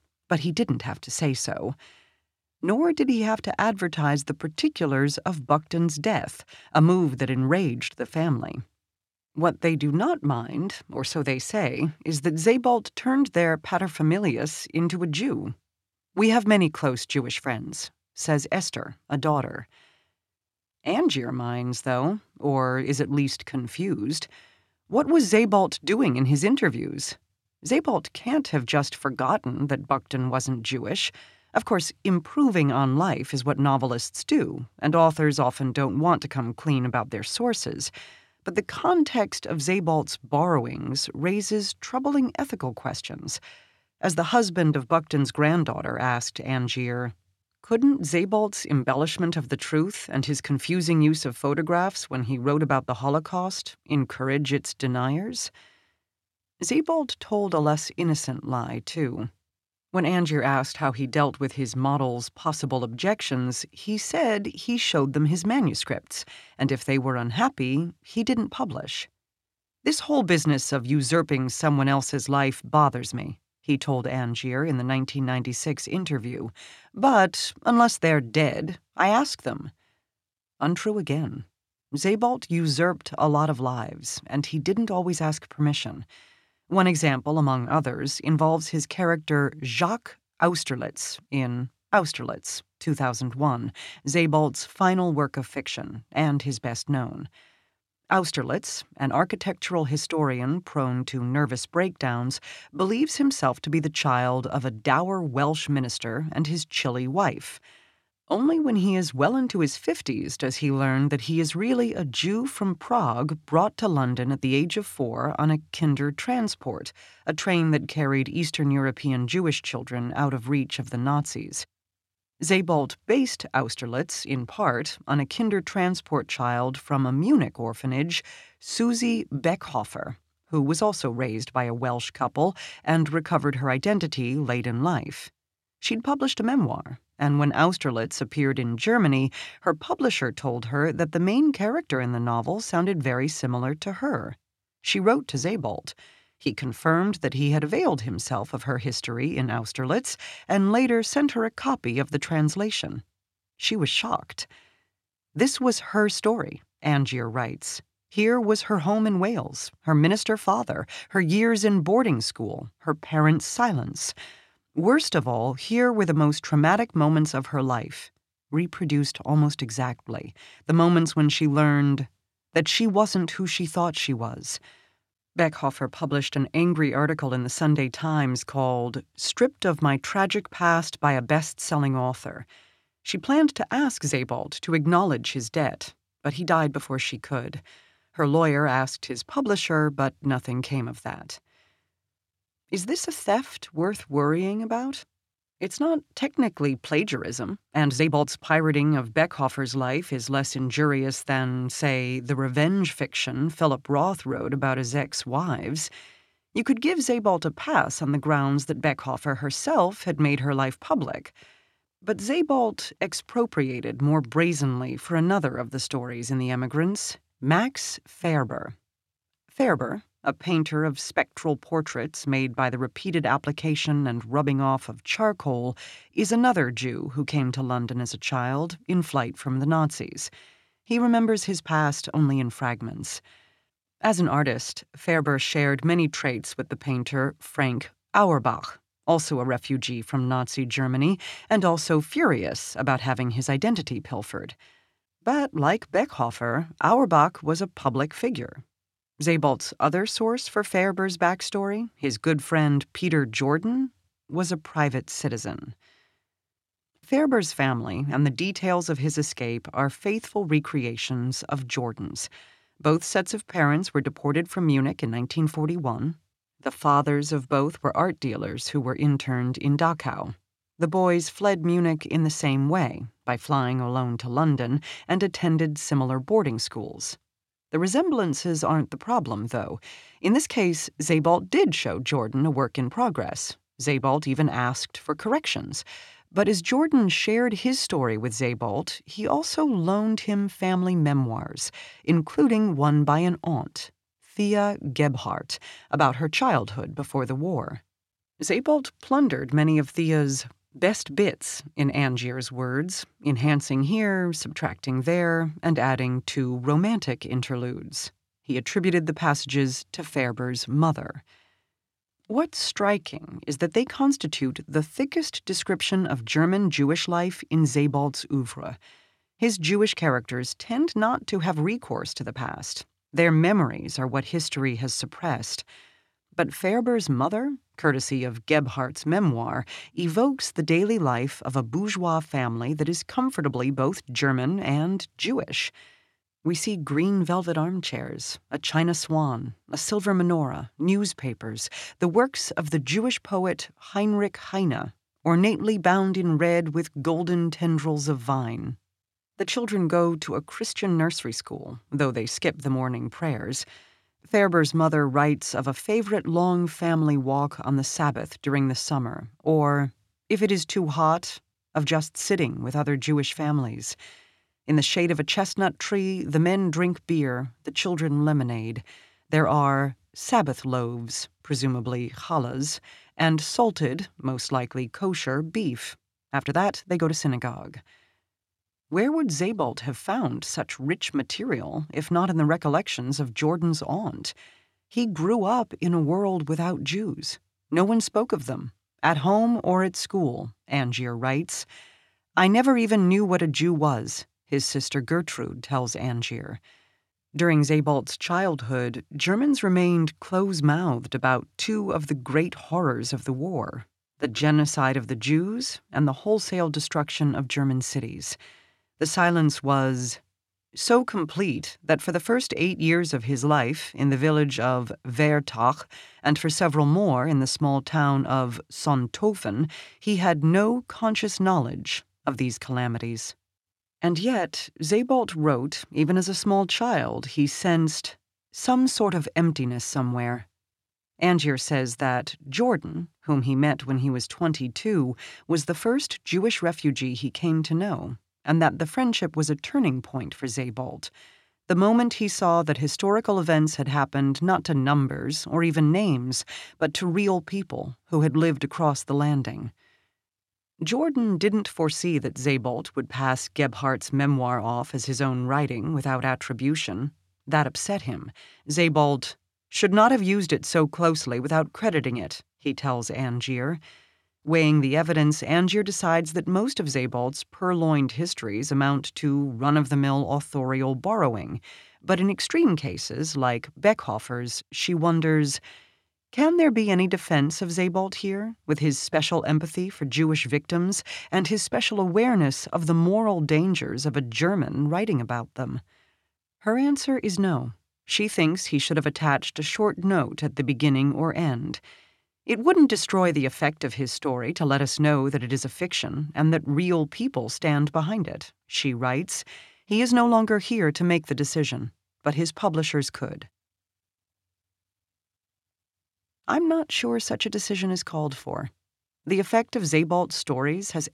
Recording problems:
uneven, jittery; strongly; from 39 s to 8:10

